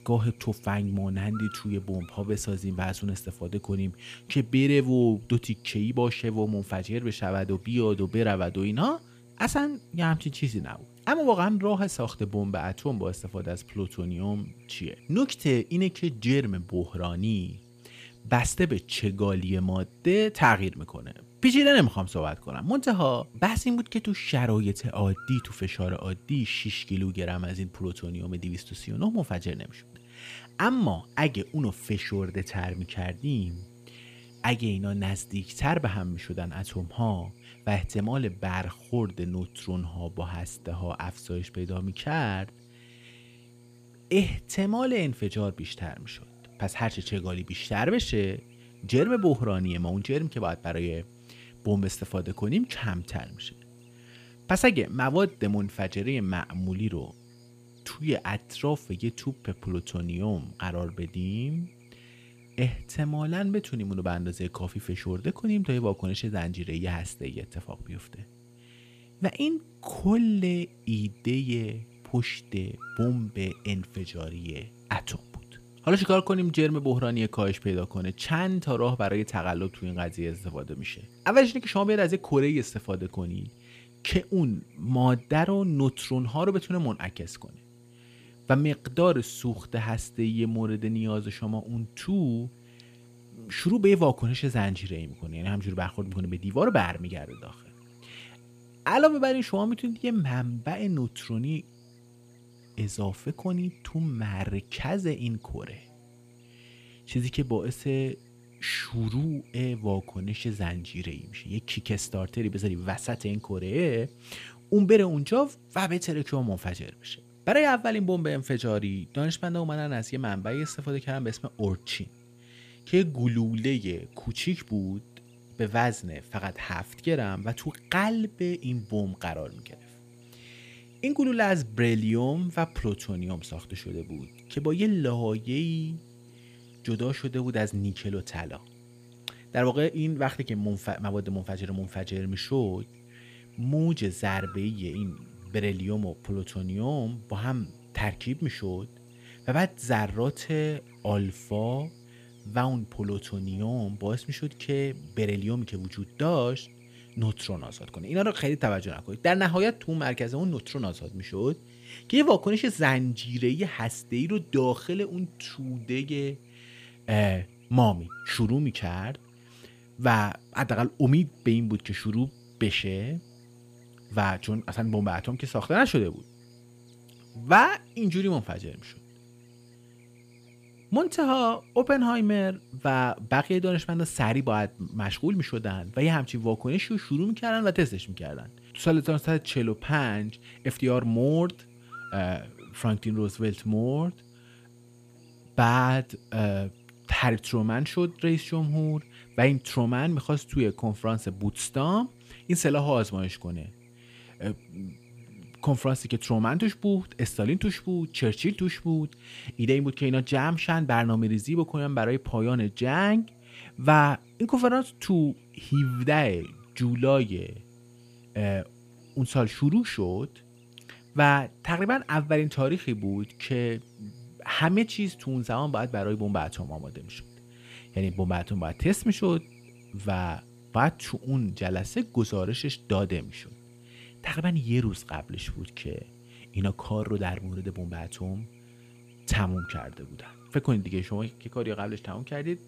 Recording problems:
electrical hum; faint; throughout; 60 Hz, 25 dB below the speech

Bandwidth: 15 kHz